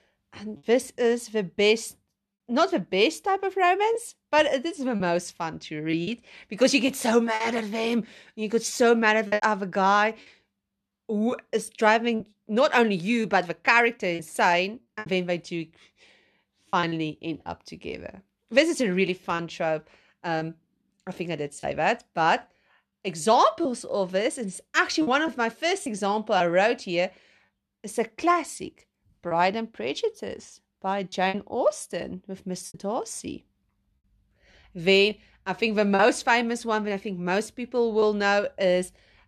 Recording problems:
choppy; occasionally; 4% of the speech affected

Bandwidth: 13.5 kHz